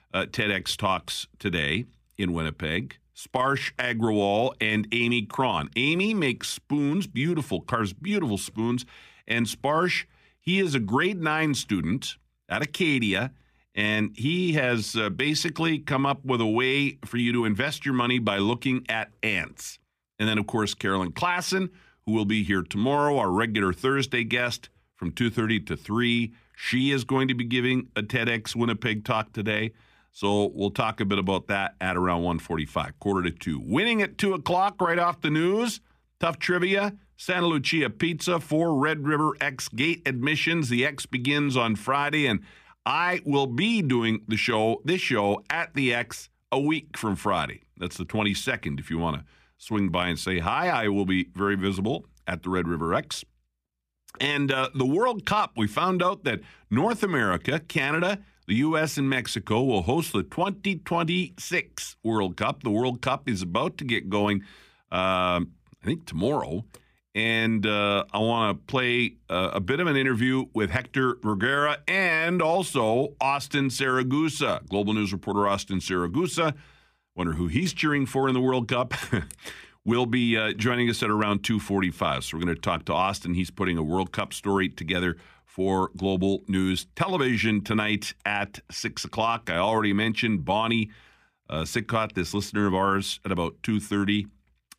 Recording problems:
none

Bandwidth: 15 kHz